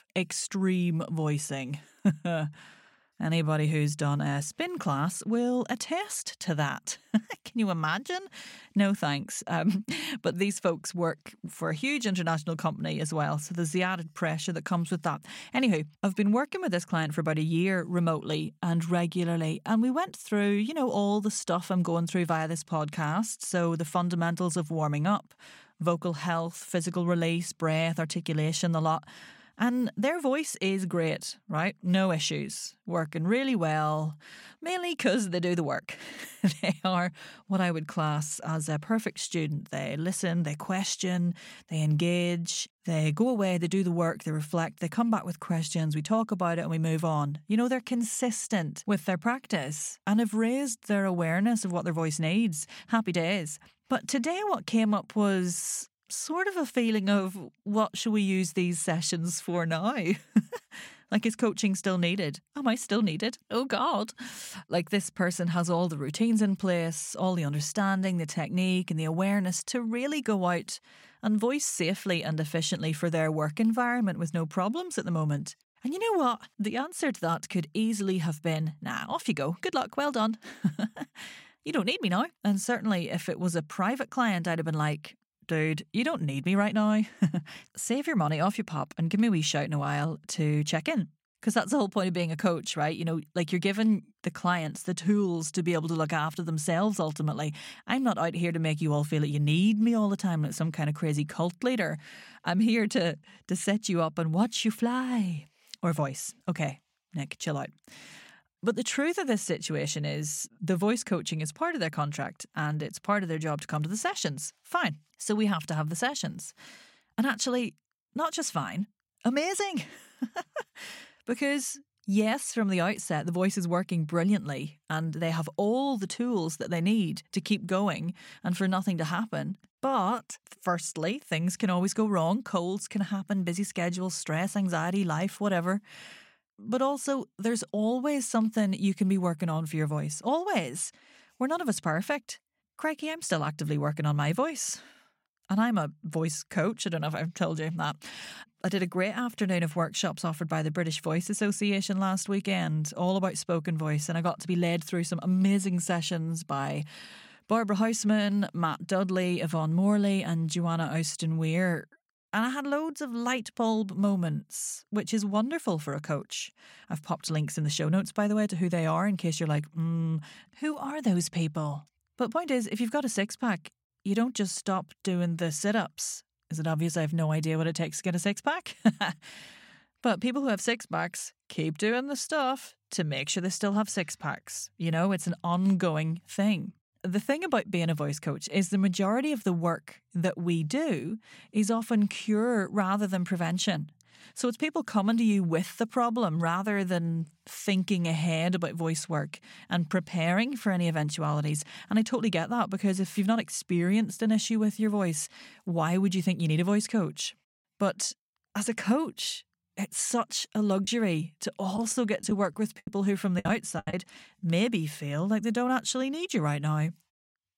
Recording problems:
choppy; very; from 3:31 to 3:34; 10% of the speech affected

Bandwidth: 16.5 kHz